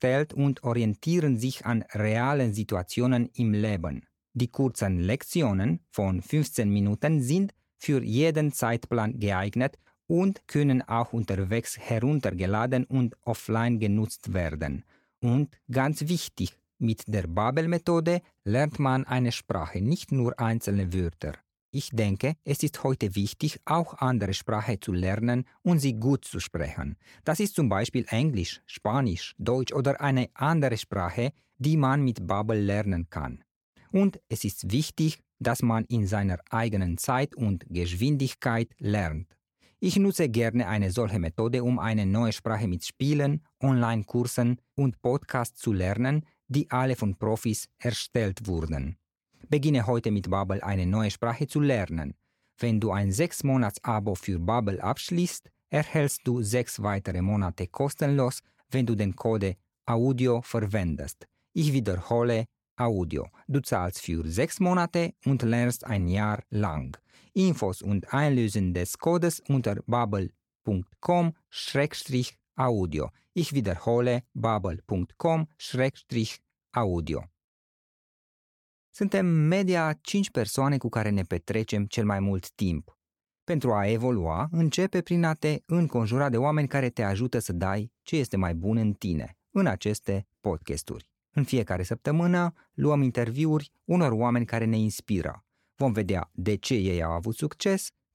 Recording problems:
none

